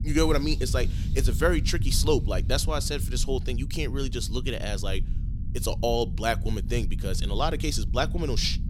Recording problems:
low rumble; noticeable; throughout; 15 dB below the speech

